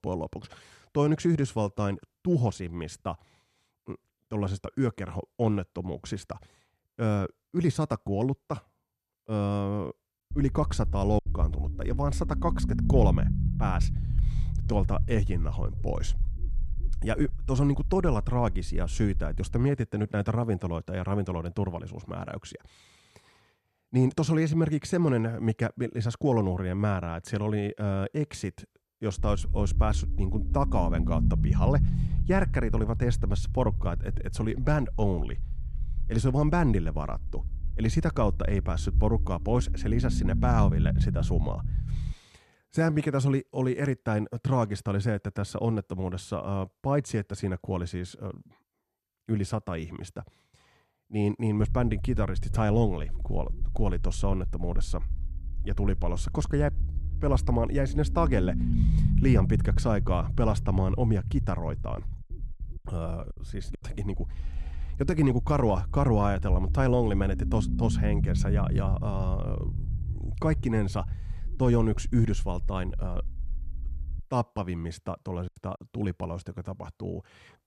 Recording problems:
low rumble; noticeable; from 10 to 20 s, from 29 to 42 s and from 52 s to 1:14; 10 dB below the speech
choppy; very; at 11 s, at 1:03 and at 1:15; 7% of the speech affected

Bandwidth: 13.5 kHz